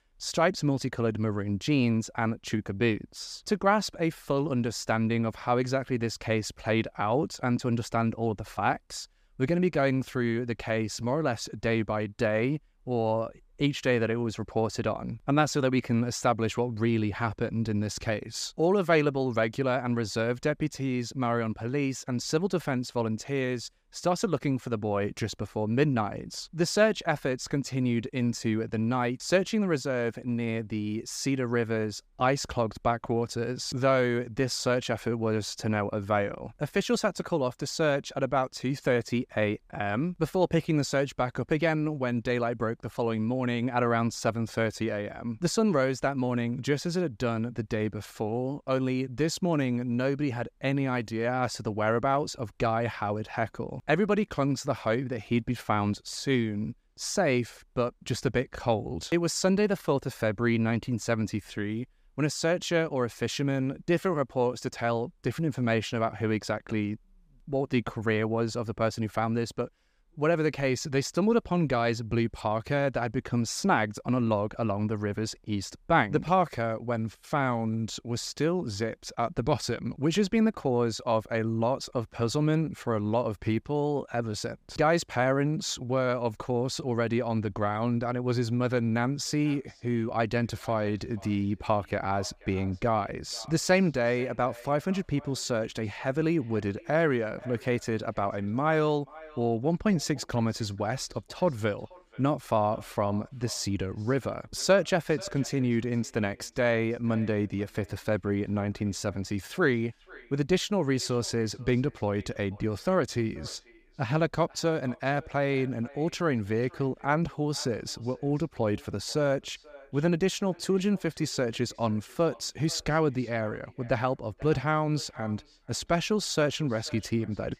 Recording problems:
echo of what is said; faint; from 1:29 on; 480 ms later, 25 dB below the speech

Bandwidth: 15 kHz